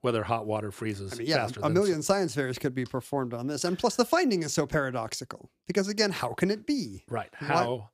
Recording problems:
none

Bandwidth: 14.5 kHz